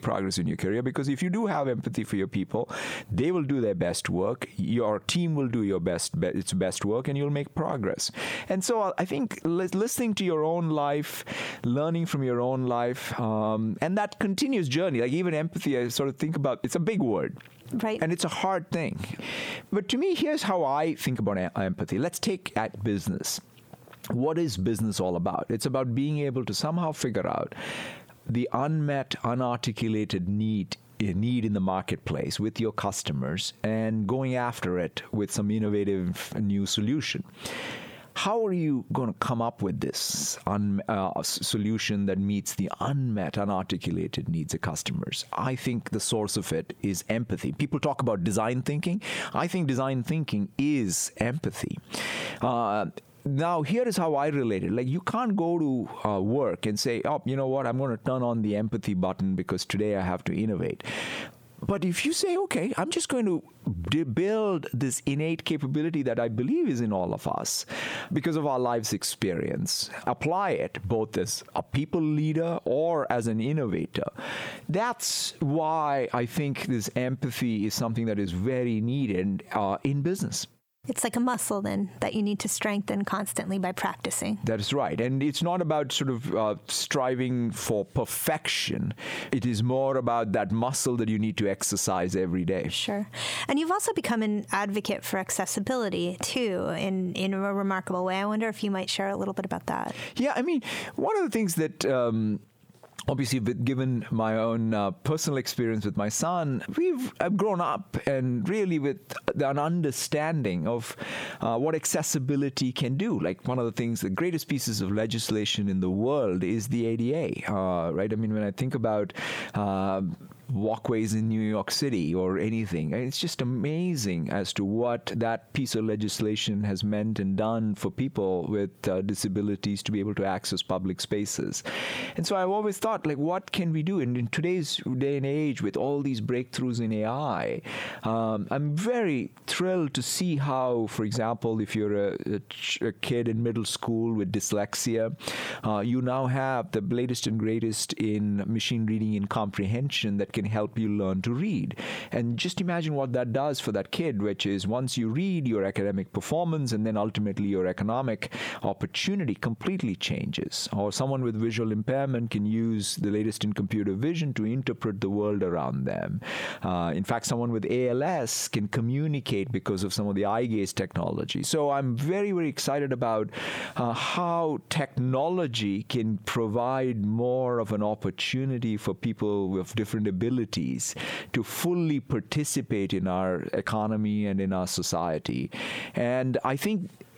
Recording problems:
squashed, flat; heavily

